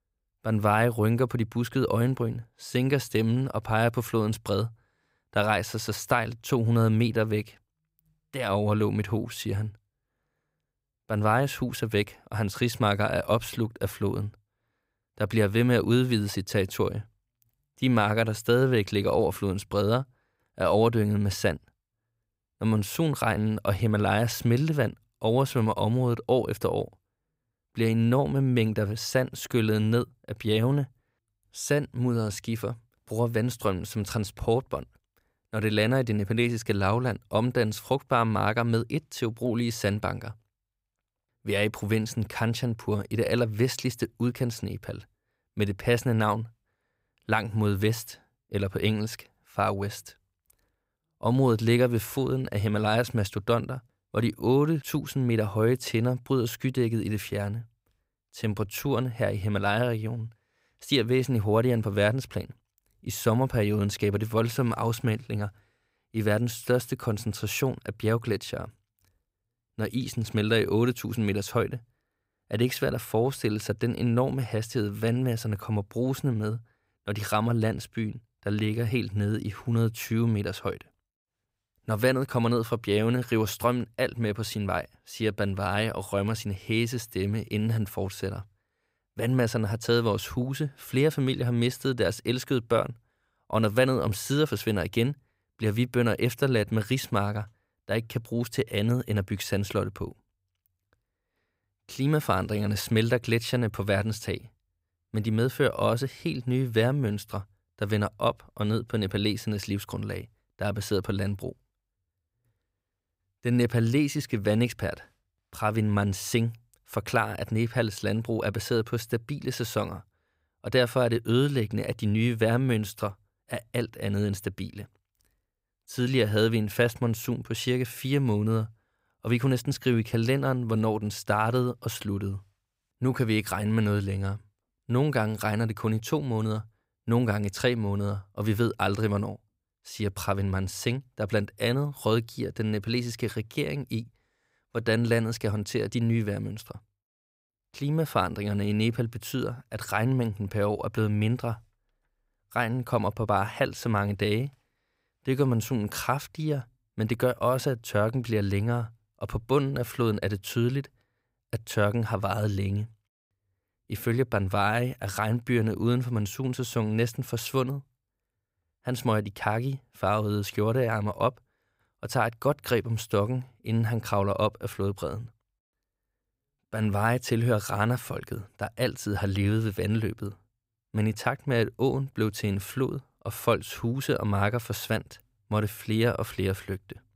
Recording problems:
none

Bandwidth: 15.5 kHz